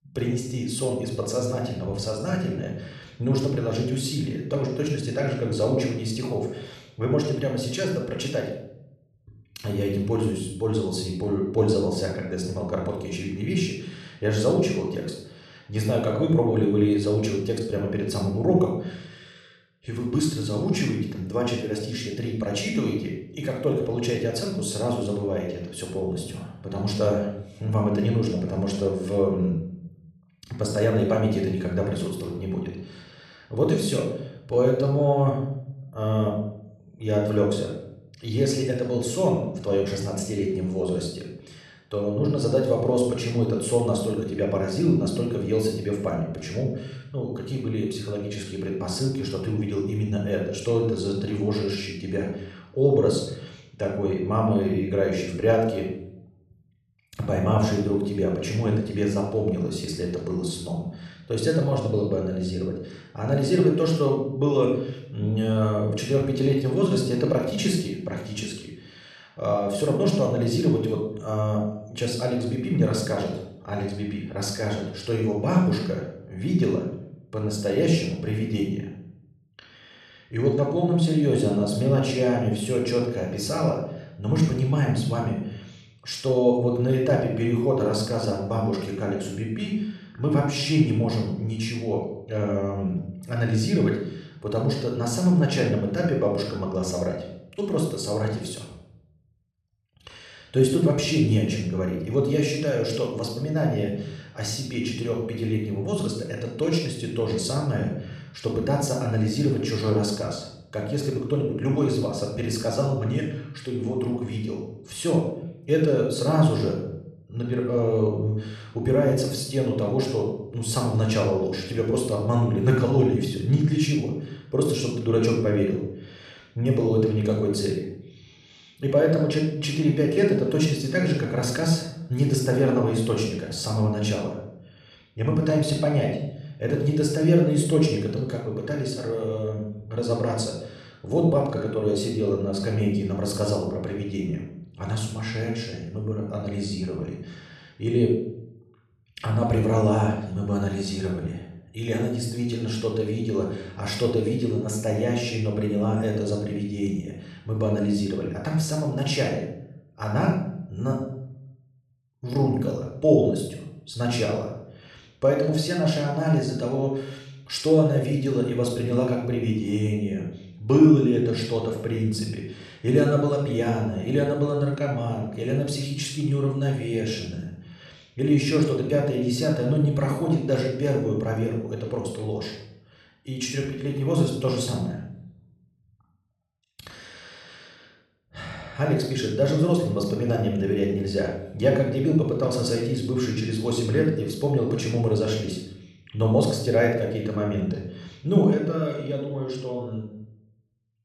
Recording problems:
room echo; noticeable; dies away in 0.6 s
off-mic speech; somewhat distant

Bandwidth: 13.5 kHz